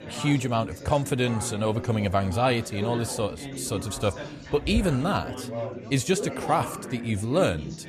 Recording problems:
chatter from many people; loud; throughout; 10 dB below the speech

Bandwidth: 14 kHz